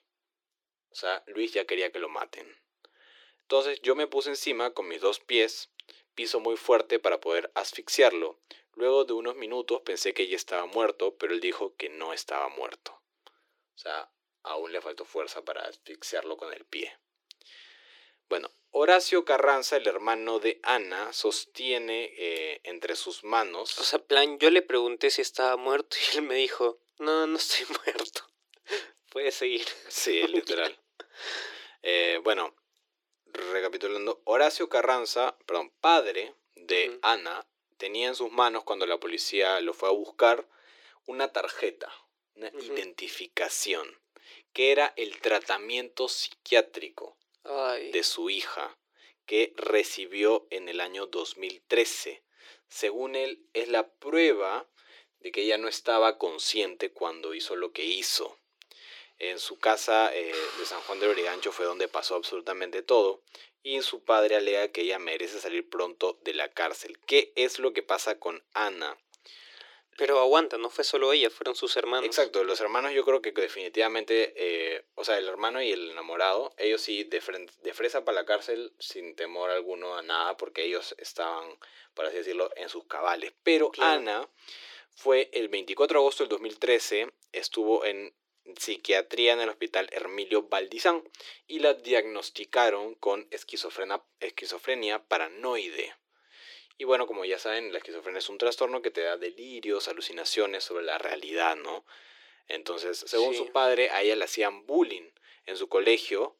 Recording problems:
thin; very; fading below 350 Hz

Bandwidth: 17.5 kHz